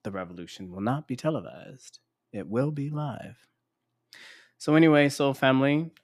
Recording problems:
none

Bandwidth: 14.5 kHz